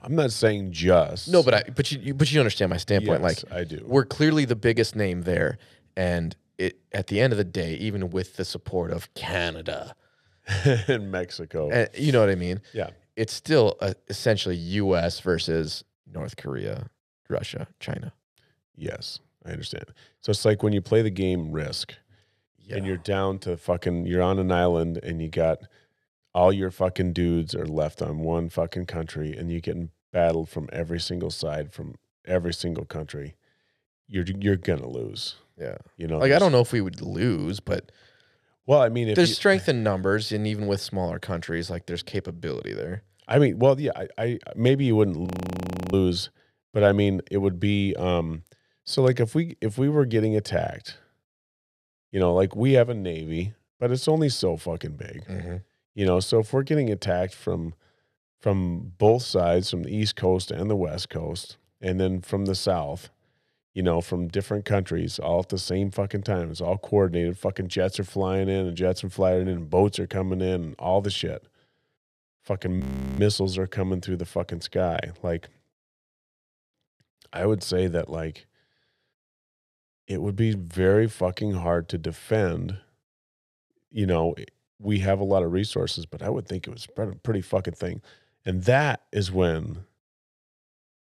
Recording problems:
audio freezing; at 45 s for 0.5 s and at 1:13

